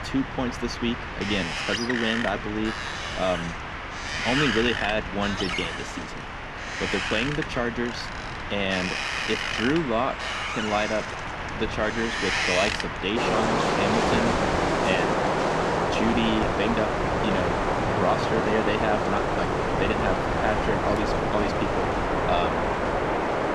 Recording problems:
wind in the background; very loud; throughout; 2 dB above the speech

